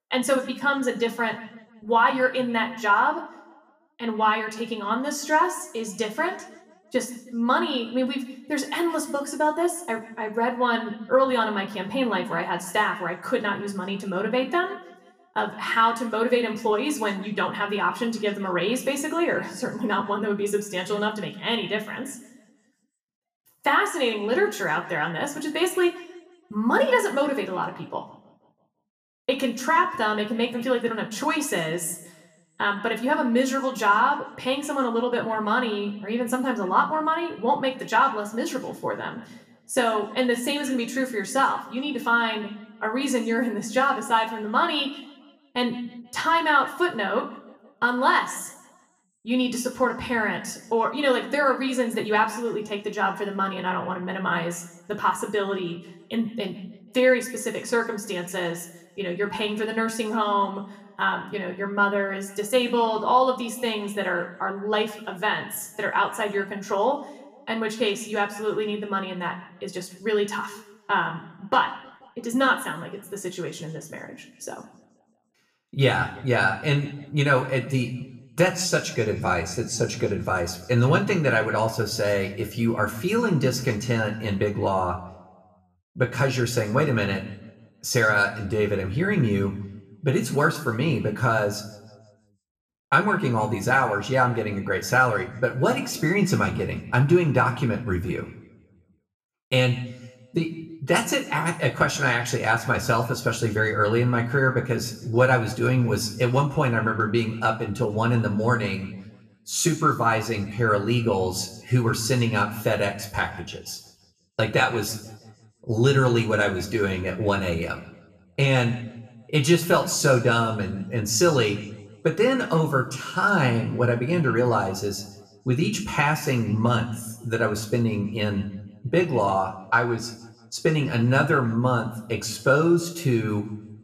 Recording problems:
room echo; slight; dies away in 0.8 s
off-mic speech; somewhat distant

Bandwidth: 14.5 kHz